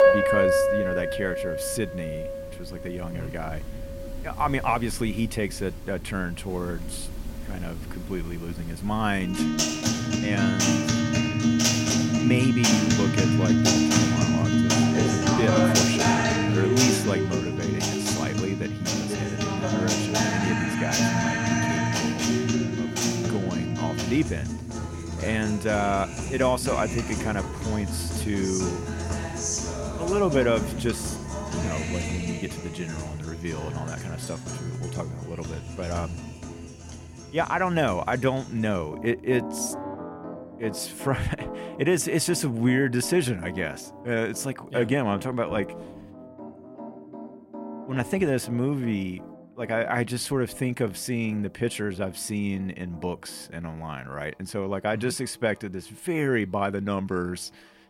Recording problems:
background music; very loud; throughout; 3 dB above the speech

